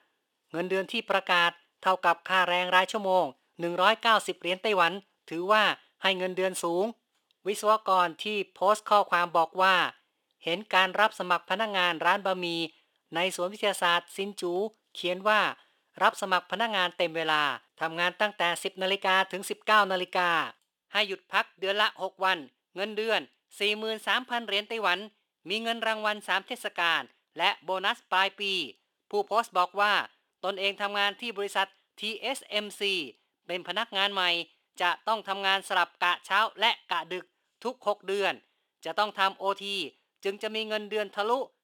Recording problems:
thin; somewhat; fading below 450 Hz

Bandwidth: 18.5 kHz